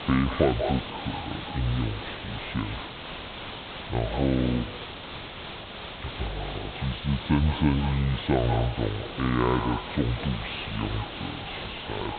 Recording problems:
echo of what is said; strong; throughout; 190 ms later, 10 dB below the speech
high frequencies cut off; severe; nothing above 4 kHz
wrong speed and pitch; too slow and too low; 0.6 times normal speed
hiss; loud; throughout; 8 dB below the speech

